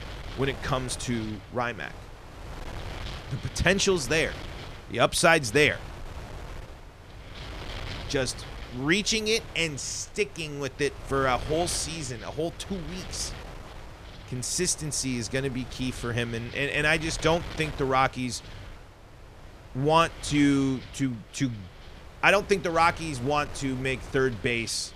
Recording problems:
wind noise on the microphone; occasional gusts; 15 dB below the speech

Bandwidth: 14.5 kHz